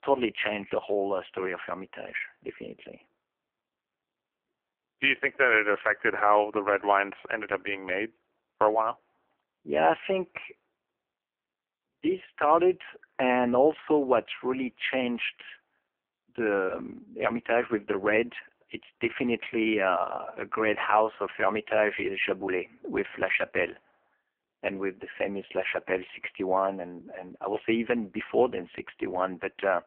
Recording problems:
phone-call audio; poor line; nothing above 3 kHz

